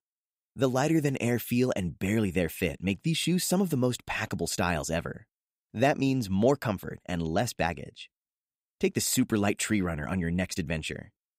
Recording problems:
none

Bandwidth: 15.5 kHz